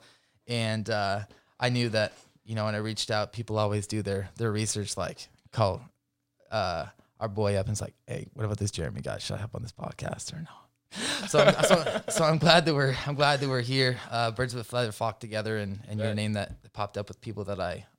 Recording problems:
none

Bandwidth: 16 kHz